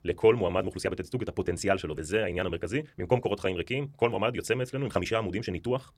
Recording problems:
wrong speed, natural pitch; too fast; 1.6 times normal speed

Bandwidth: 16.5 kHz